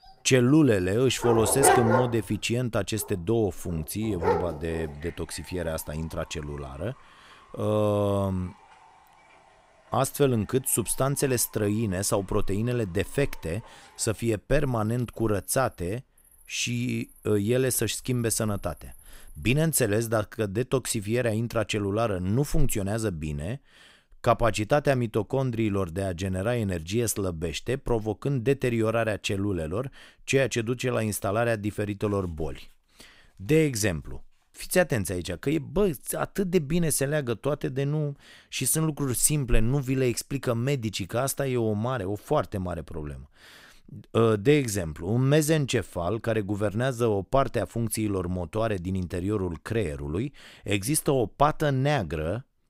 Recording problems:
animal sounds; loud; until 19 s; 1 dB below the speech

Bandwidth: 15.5 kHz